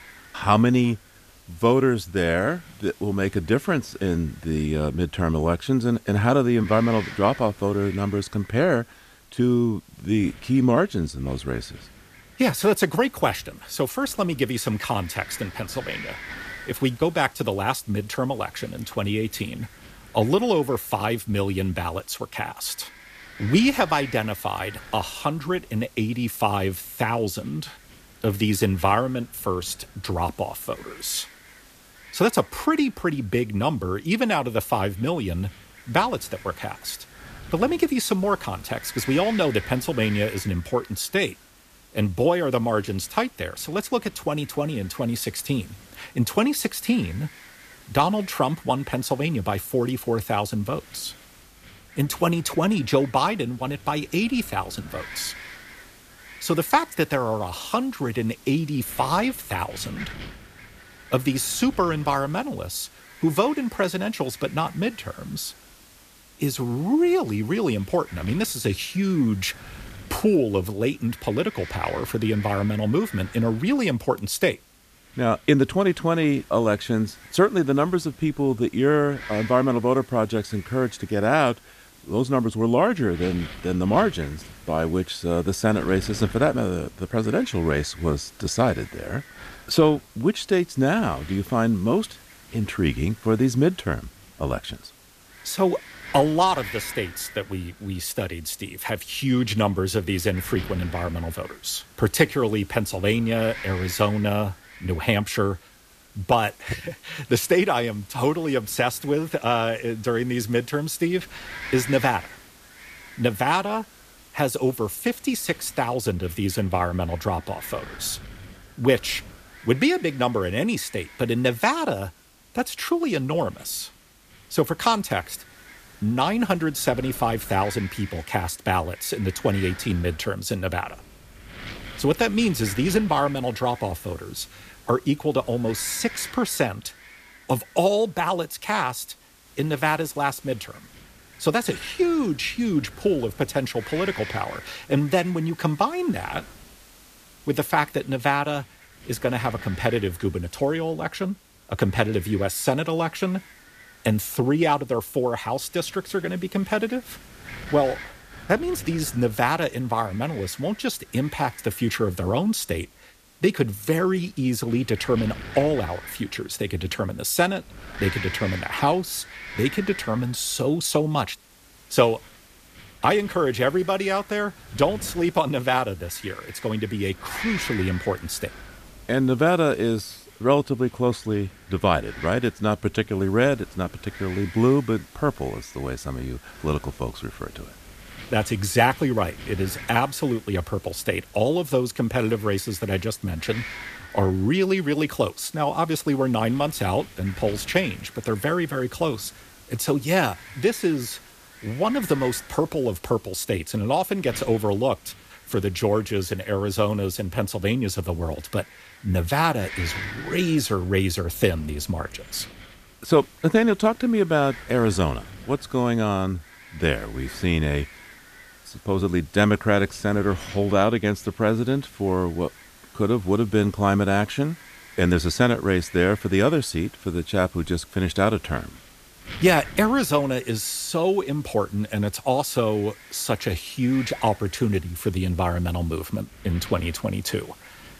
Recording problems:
wind noise on the microphone; occasional gusts; 15 dB below the speech
hiss; faint; throughout; 25 dB below the speech

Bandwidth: 14.5 kHz